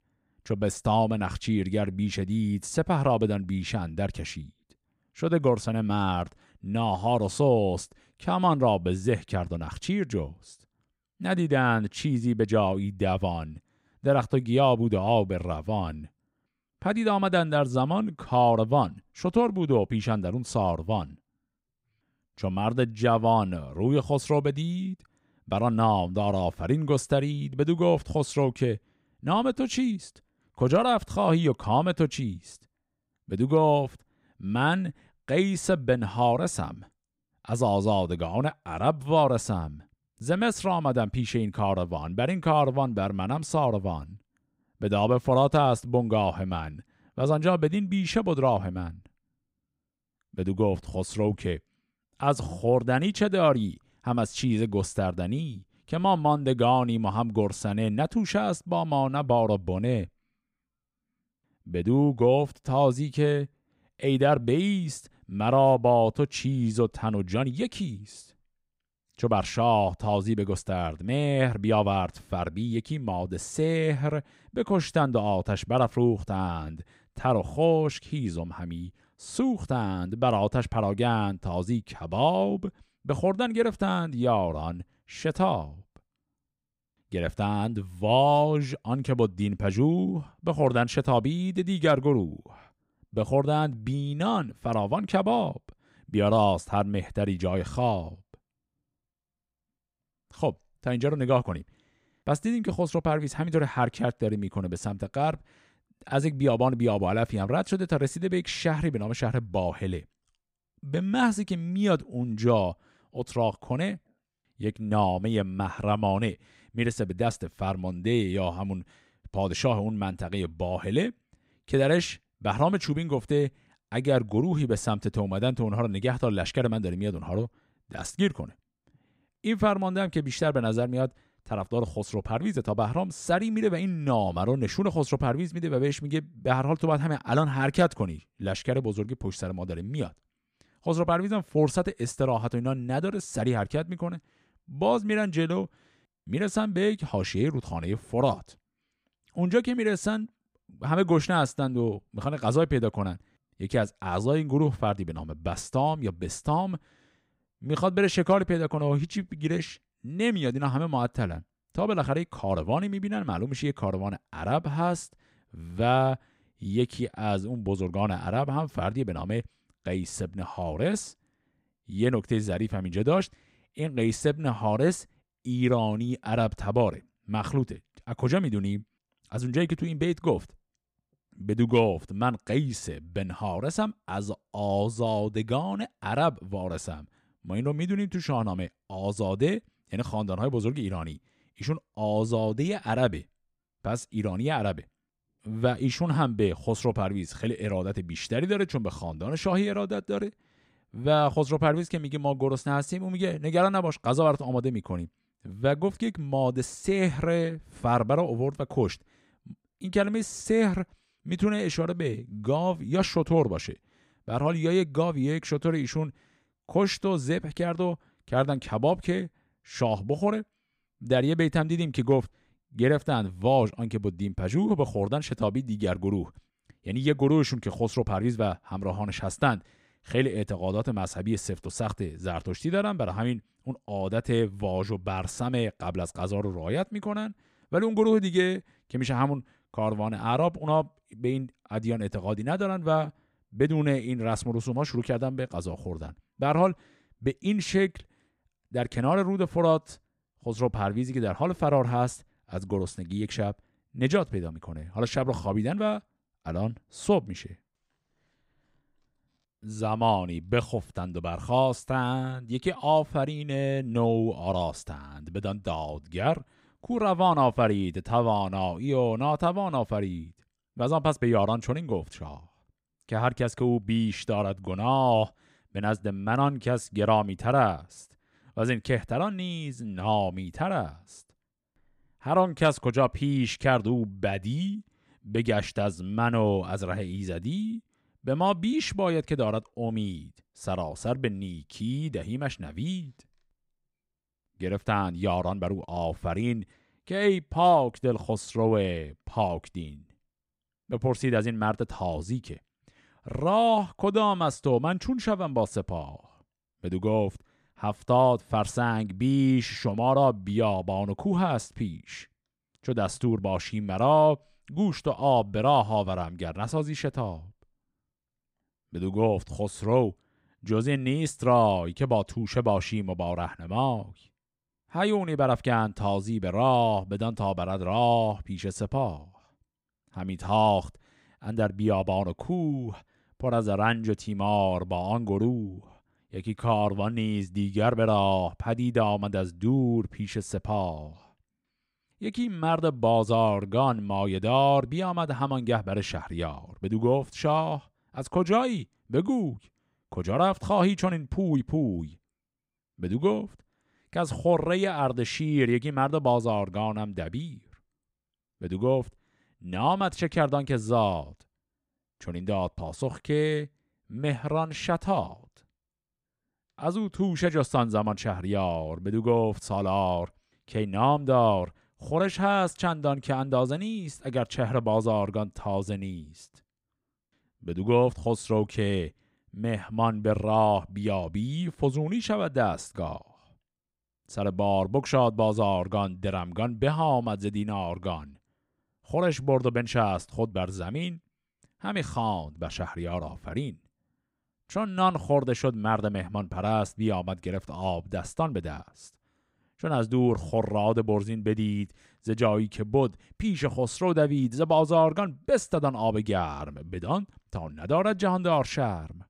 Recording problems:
none

